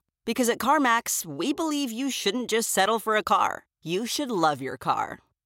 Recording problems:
none

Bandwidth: 16 kHz